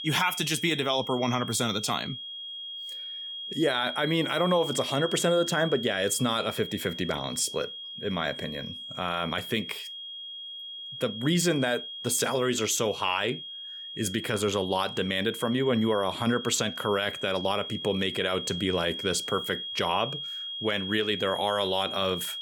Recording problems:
high-pitched whine; loud; throughout; 3.5 kHz, 7 dB below the speech

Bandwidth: 18 kHz